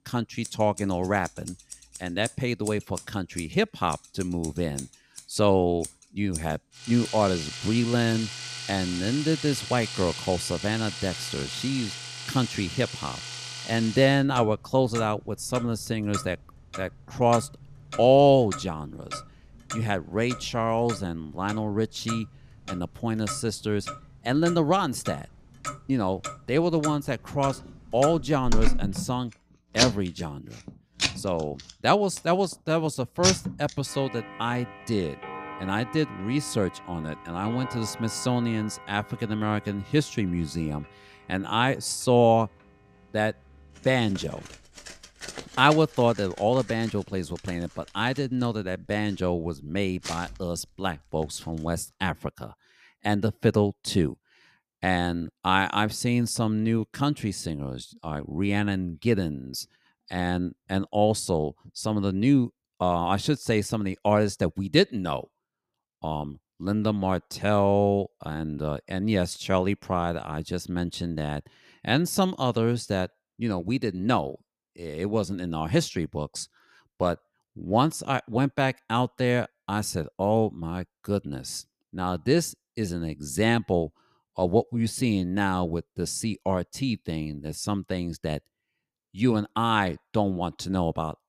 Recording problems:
household noises; loud; until 51 s; 9 dB below the speech

